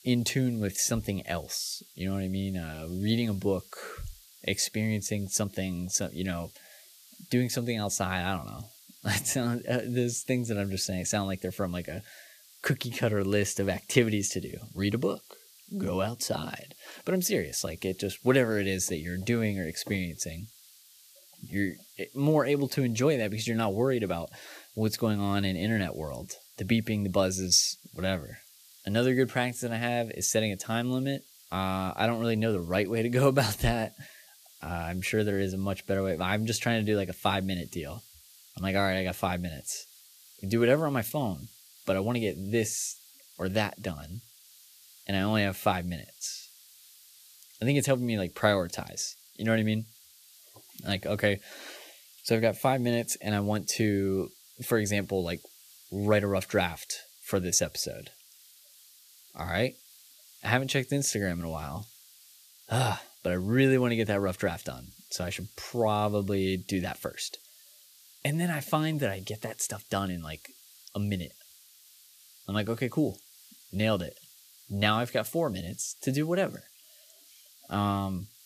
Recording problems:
hiss; faint; throughout; 25 dB below the speech

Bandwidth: 14.5 kHz